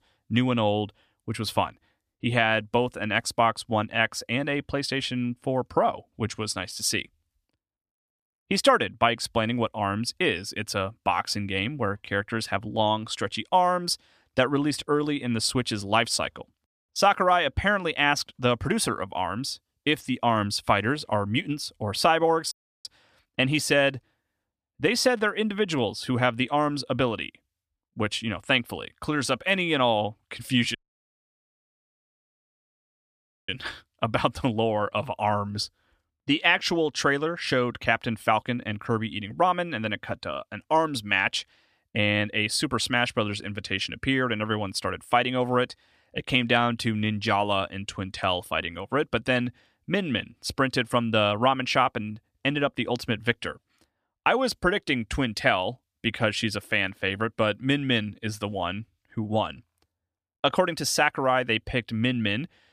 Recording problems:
audio cutting out; at 23 s and at 31 s for 2.5 s

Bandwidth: 14.5 kHz